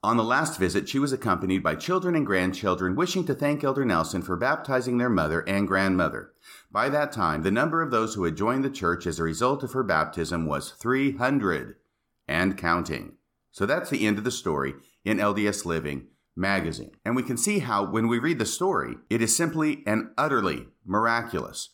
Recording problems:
none

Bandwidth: 17.5 kHz